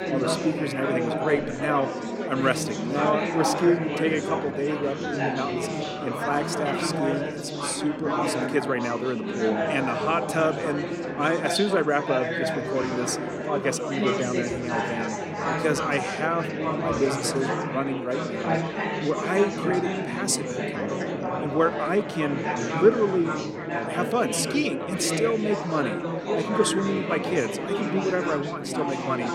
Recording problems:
chatter from many people; loud; throughout; 1 dB below the speech

